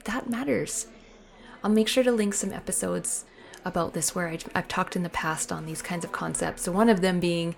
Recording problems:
murmuring crowd; faint; throughout; 20 dB below the speech

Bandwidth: 17.5 kHz